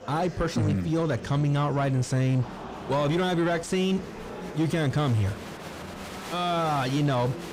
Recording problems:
distortion; slight; 10 dB below the speech
murmuring crowd; noticeable; throughout; 15 dB below the speech

